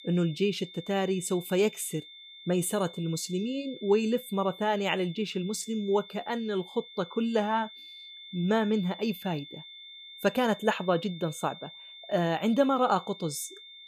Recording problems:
high-pitched whine; noticeable; throughout; 3.5 kHz, 15 dB below the speech

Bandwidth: 14.5 kHz